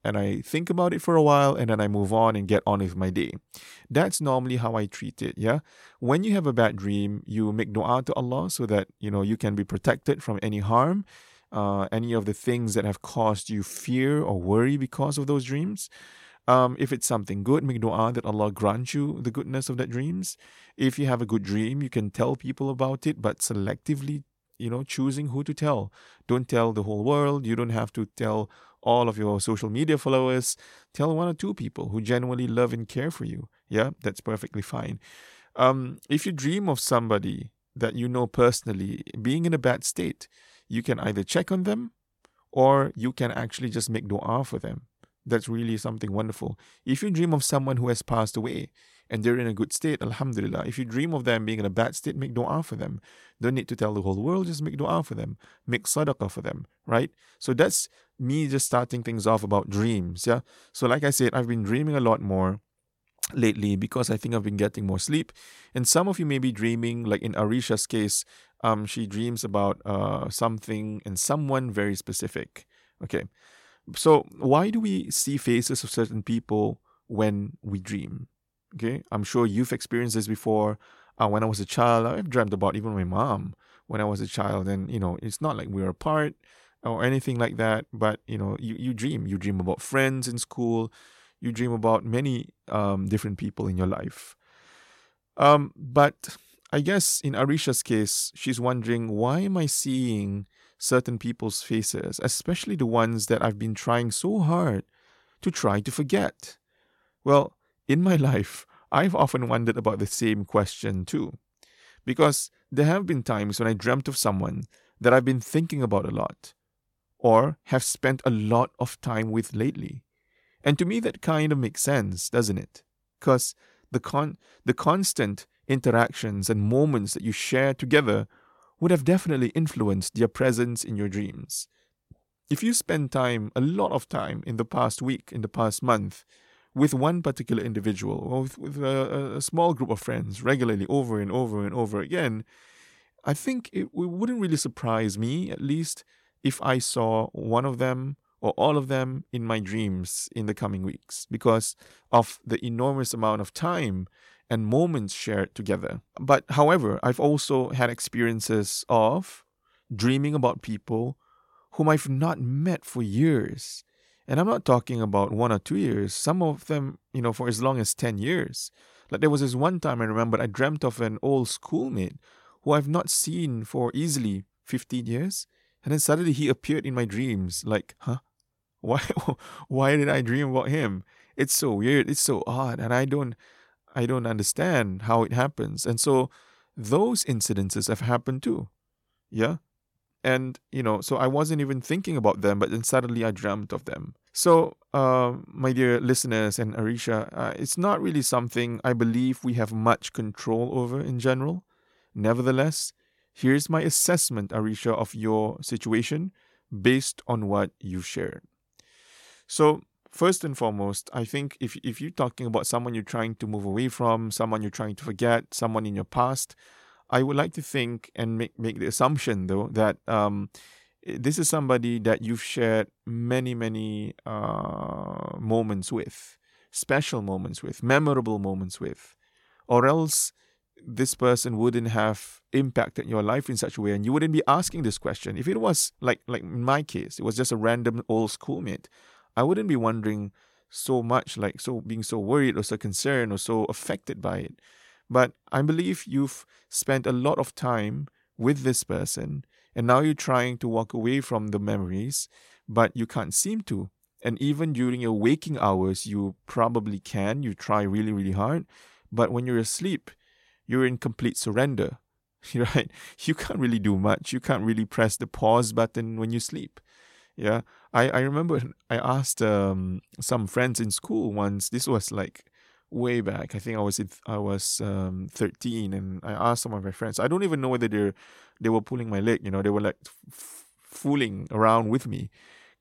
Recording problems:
none

